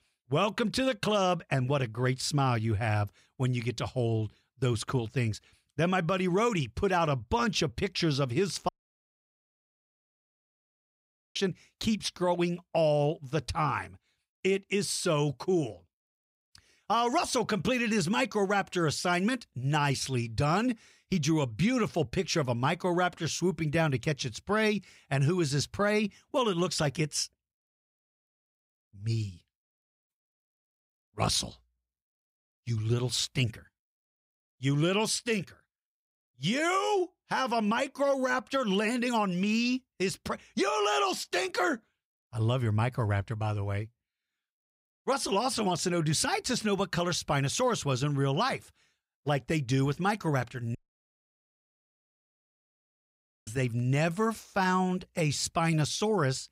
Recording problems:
audio cutting out; at 8.5 s for 2.5 s and at 51 s for 2.5 s

